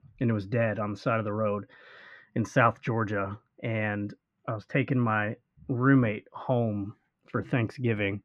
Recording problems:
muffled; very; fading above 2 kHz

